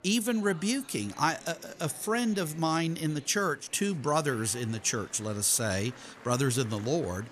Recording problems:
murmuring crowd; faint; throughout; 20 dB below the speech

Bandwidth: 14.5 kHz